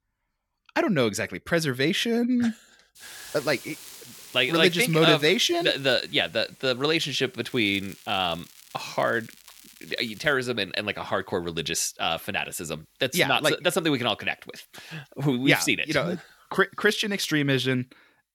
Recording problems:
hiss; faint; throughout; 25 dB below the speech
crackling; faint; from 3.5 to 6 s and from 7.5 to 10 s; 25 dB below the speech

